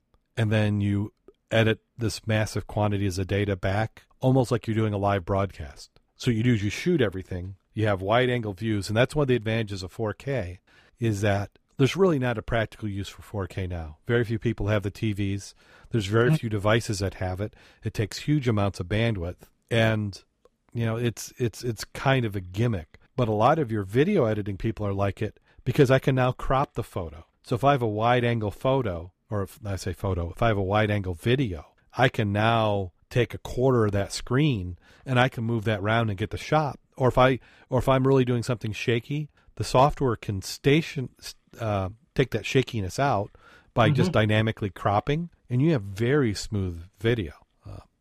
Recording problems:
none

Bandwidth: 15 kHz